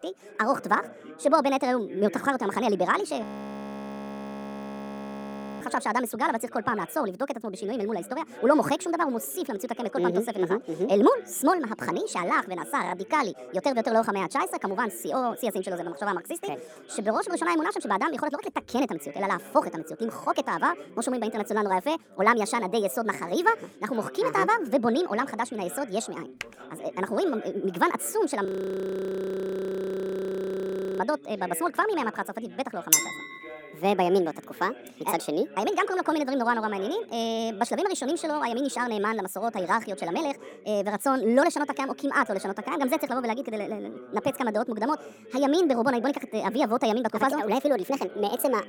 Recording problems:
wrong speed and pitch; too fast and too high; 1.5 times normal speed
background chatter; noticeable; throughout; 2 voices, 20 dB below the speech
audio freezing; at 3 s for 2.5 s and at 28 s for 2.5 s
keyboard typing; very faint; at 26 s; peak 15 dB below the speech
clattering dishes; loud; at 33 s; peak 6 dB above the speech

